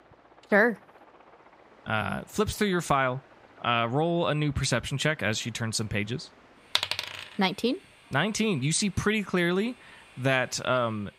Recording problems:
train or aircraft noise; faint; throughout; 25 dB below the speech

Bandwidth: 15.5 kHz